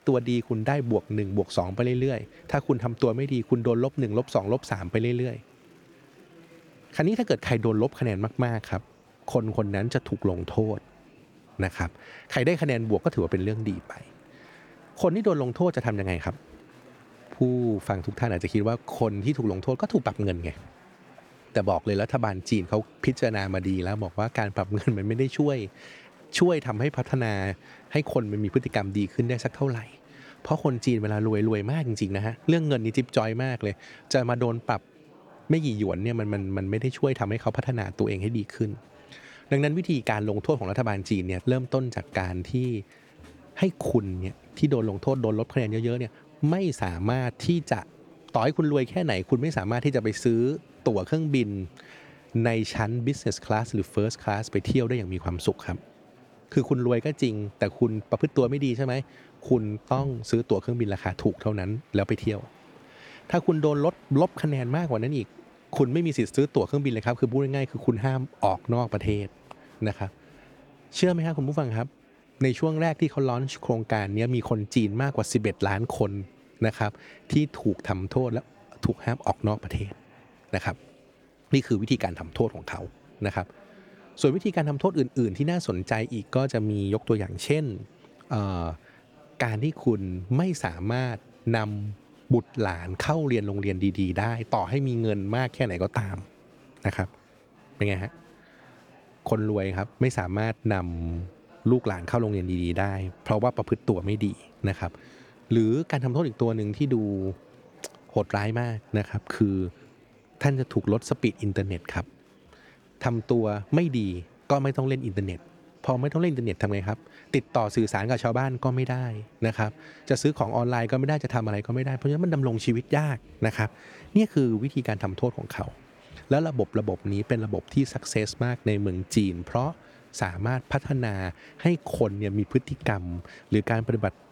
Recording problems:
murmuring crowd; faint; throughout; 25 dB below the speech

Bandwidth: 18.5 kHz